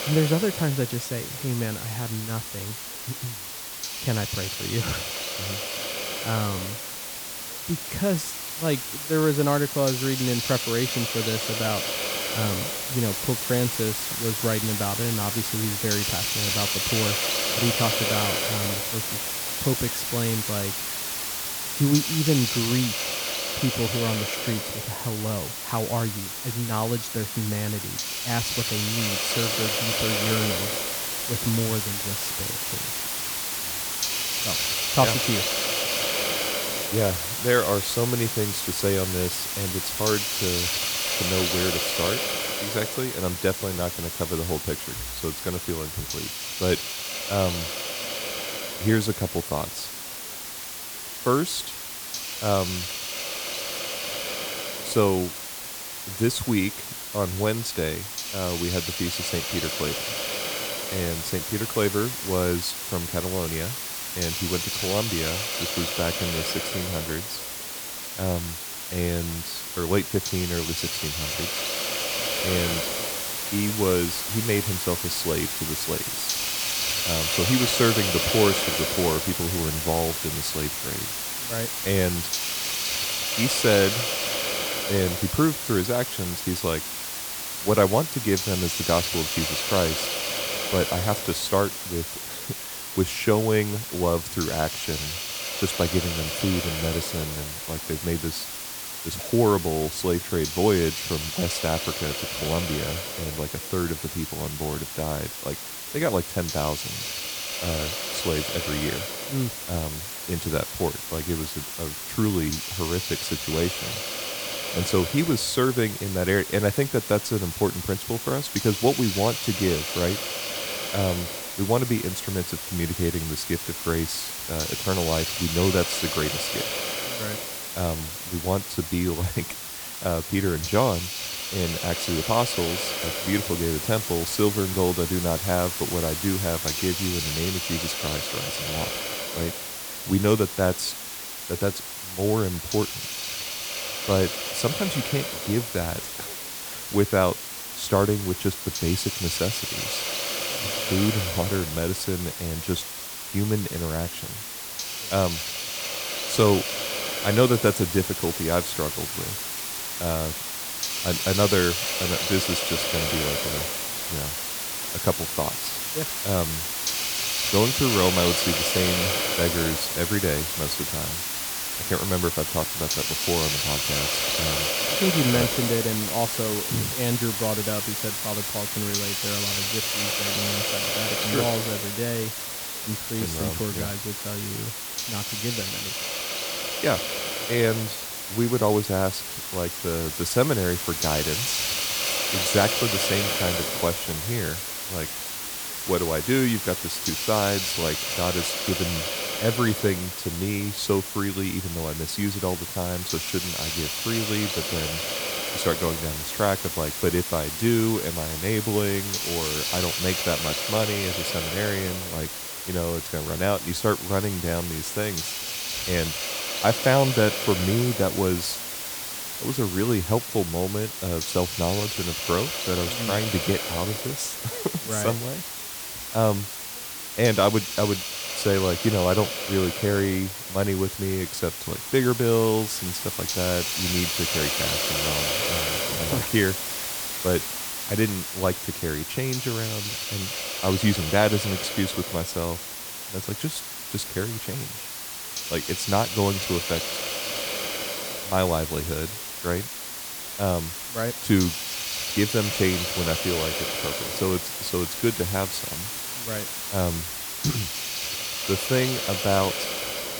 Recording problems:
hiss; loud; throughout; as loud as the speech
background chatter; faint; throughout; 3 voices, 30 dB below the speech

